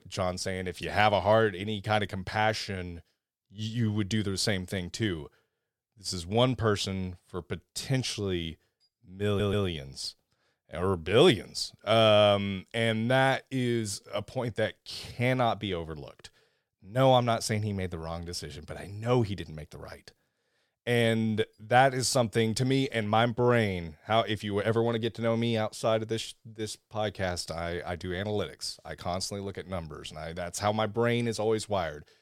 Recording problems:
audio stuttering; at 9.5 s

